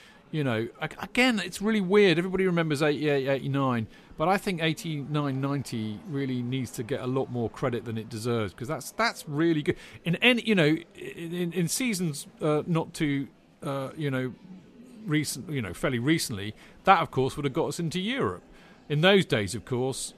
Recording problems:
chatter from many people; faint; throughout; 25 dB below the speech

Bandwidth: 14 kHz